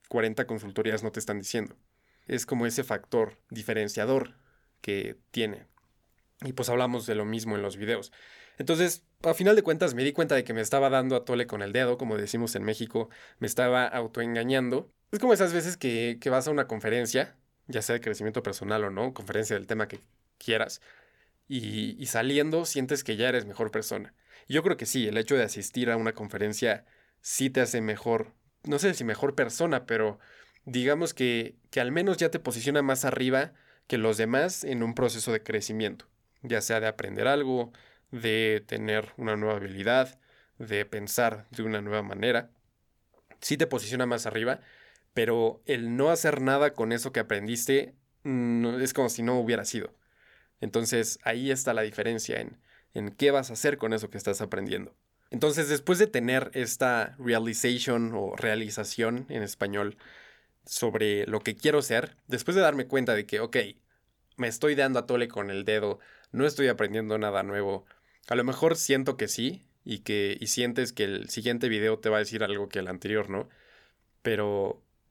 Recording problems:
none

